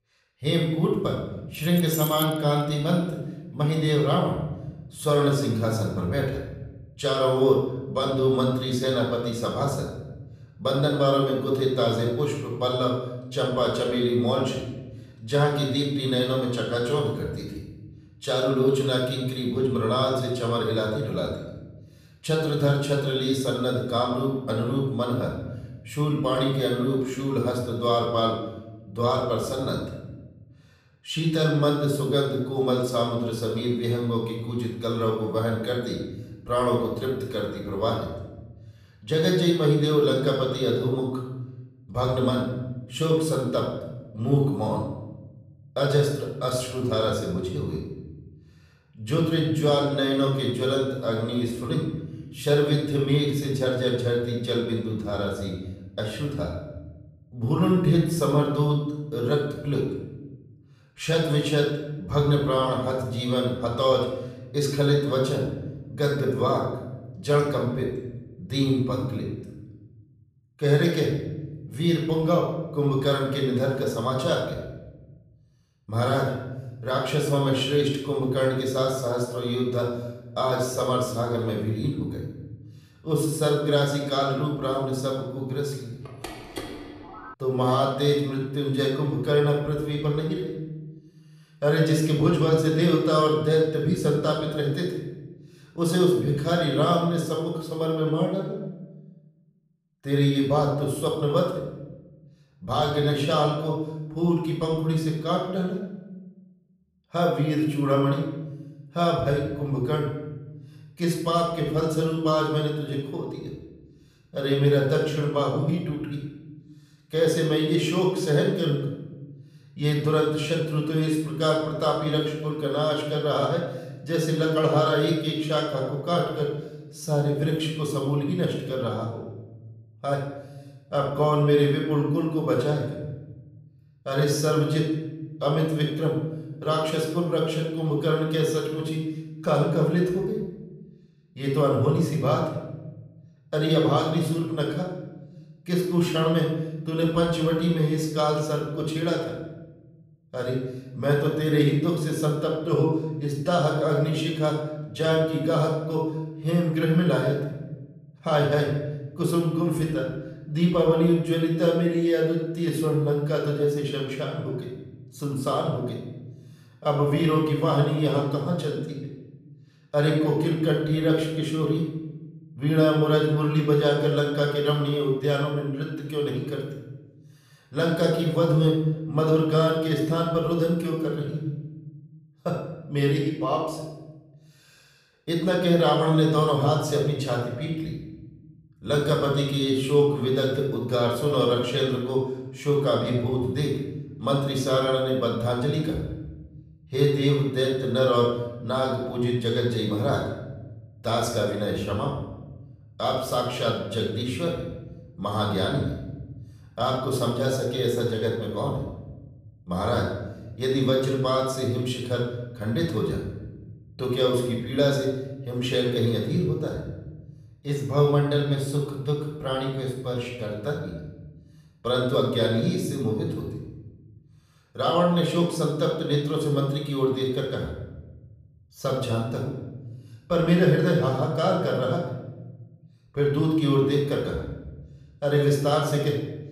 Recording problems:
off-mic speech; far
room echo; noticeable; dies away in 1.1 s
jangling keys; noticeable; at 1.5 s; peak 5 dB below the speech
phone ringing; faint; from 1:26 to 1:27; peak 10 dB below the speech

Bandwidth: 14.5 kHz